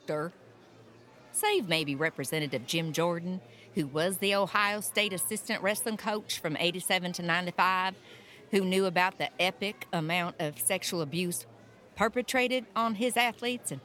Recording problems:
murmuring crowd; faint; throughout; 25 dB below the speech

